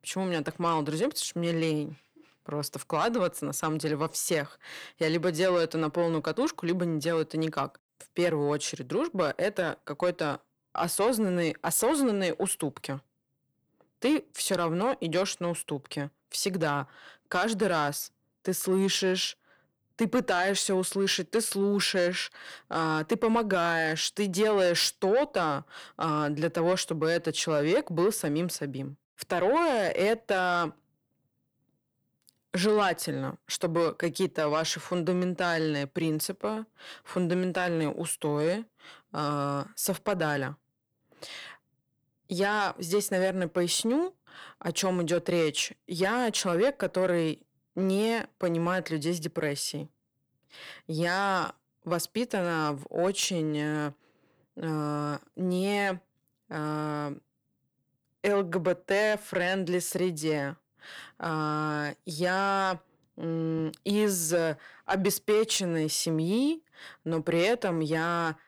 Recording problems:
distortion; slight; 10 dB below the speech

